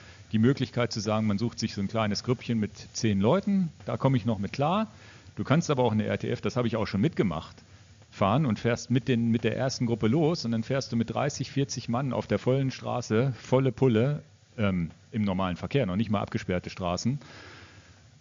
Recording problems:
high frequencies cut off; noticeable; nothing above 7 kHz
hiss; faint; throughout; 25 dB below the speech

